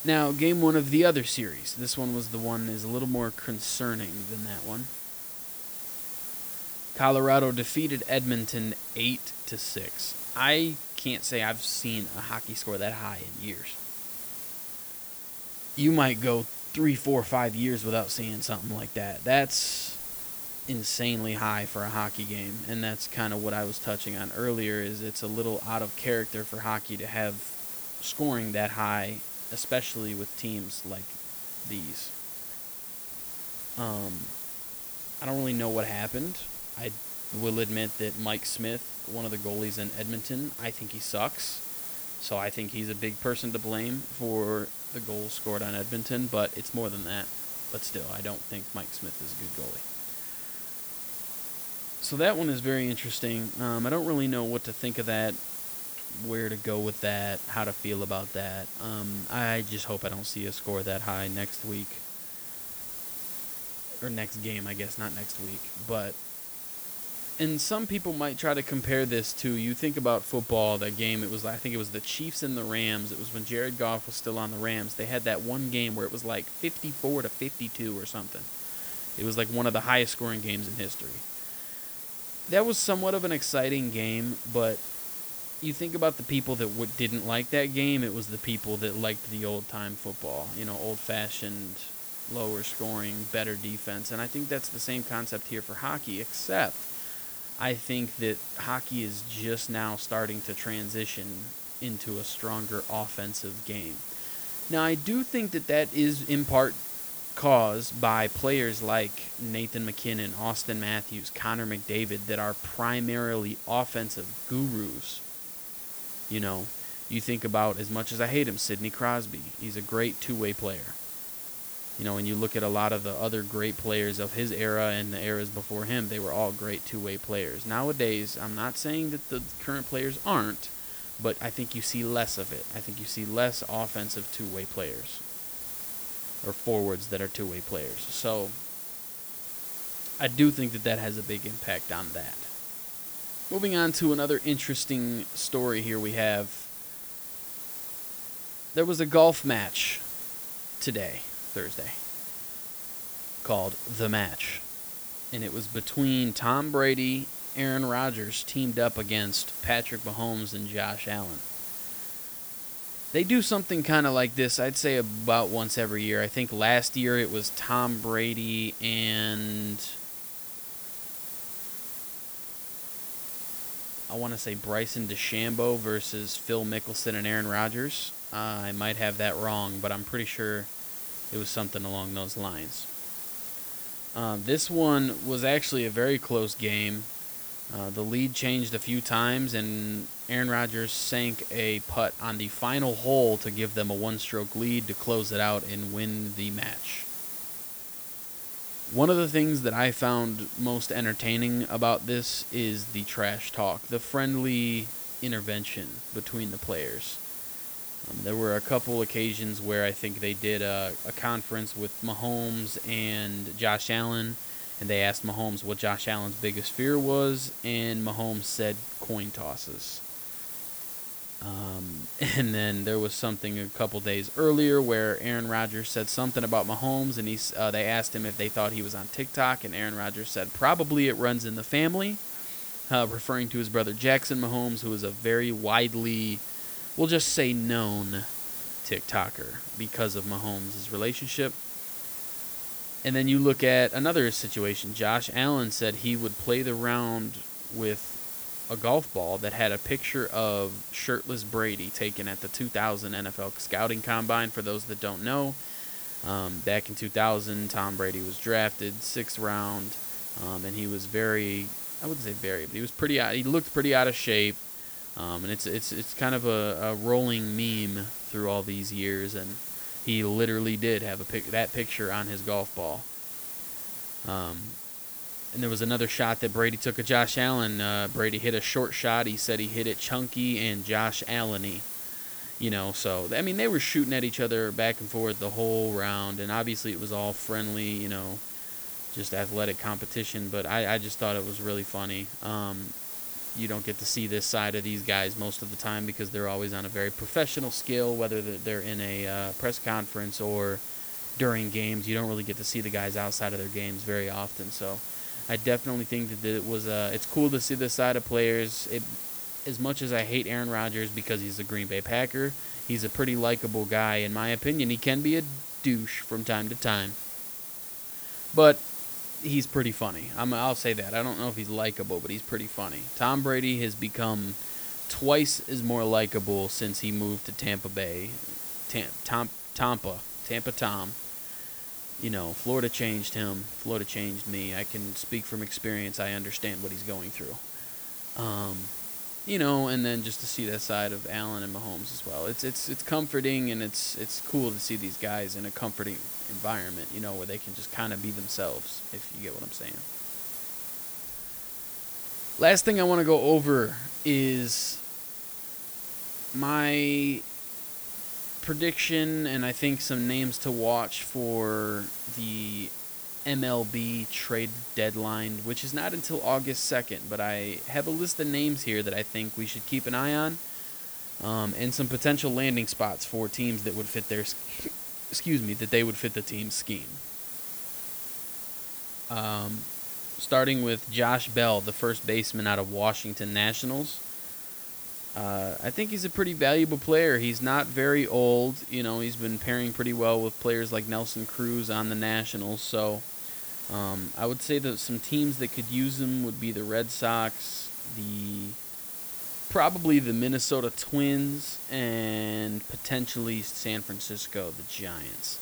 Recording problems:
hiss; loud; throughout; 5 dB below the speech

